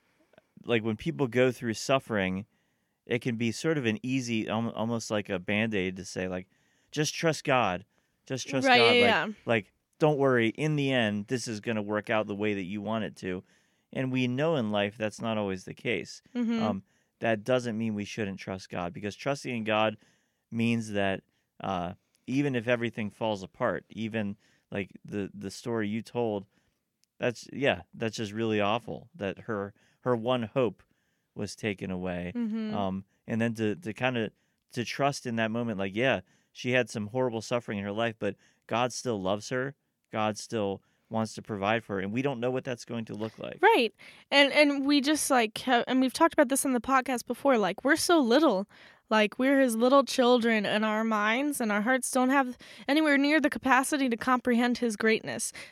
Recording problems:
none

